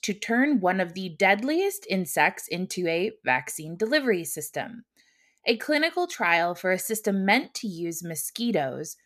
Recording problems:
none

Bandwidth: 14 kHz